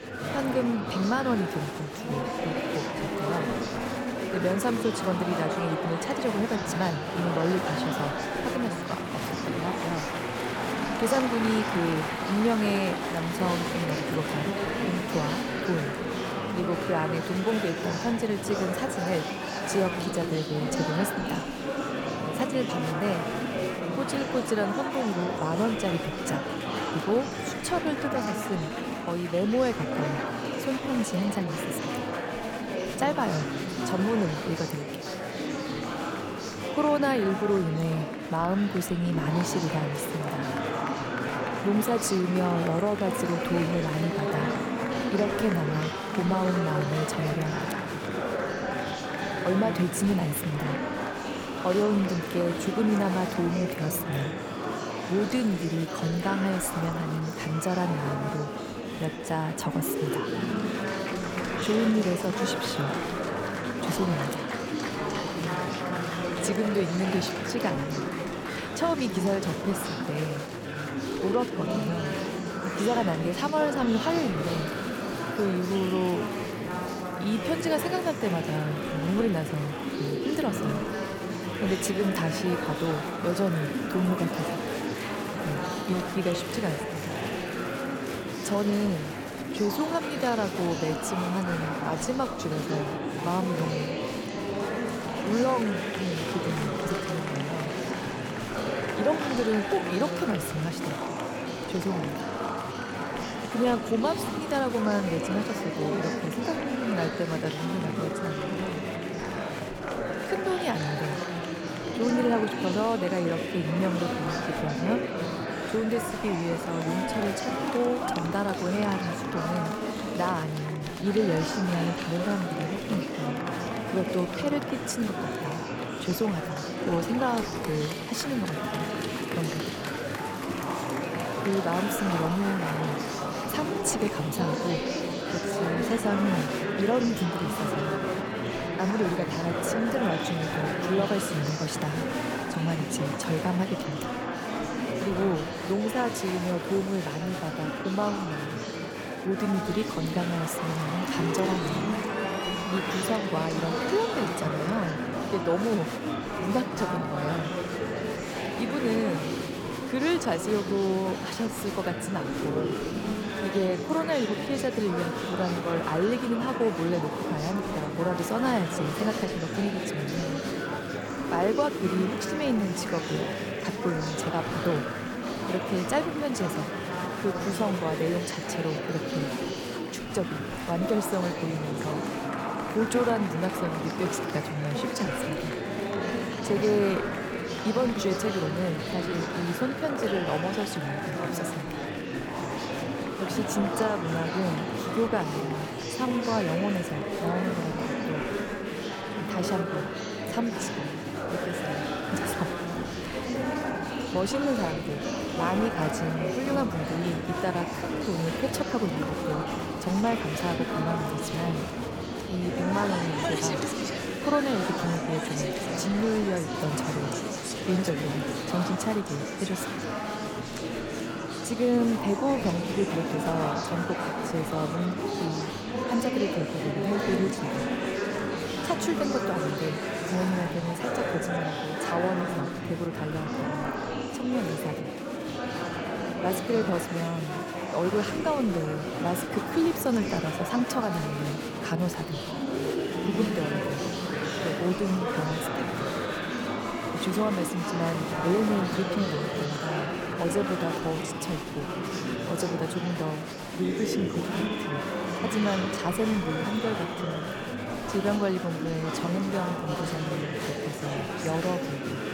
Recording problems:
murmuring crowd; loud; throughout; 1 dB below the speech

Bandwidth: 18 kHz